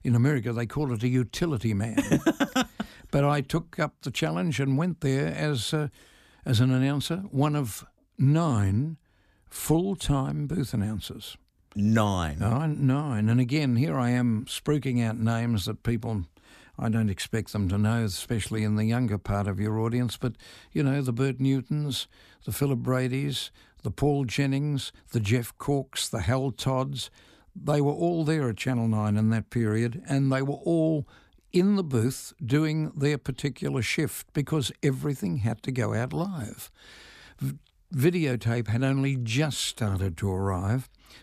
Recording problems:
none

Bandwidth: 14.5 kHz